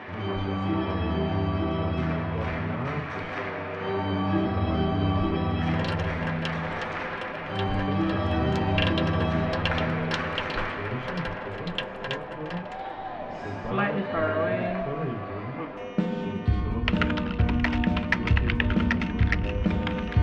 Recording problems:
off-mic speech; far
muffled; very; fading above 3 kHz
room echo; very slight; dies away in 0.2 s
background music; very loud; throughout; 9 dB above the speech
household noises; very loud; from 5.5 s on; 5 dB above the speech

